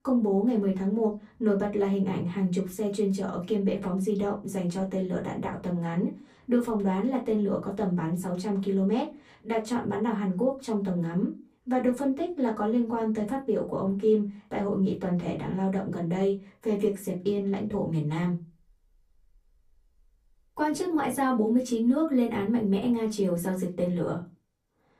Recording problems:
off-mic speech; far
room echo; very slight; dies away in 0.2 s

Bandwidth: 15 kHz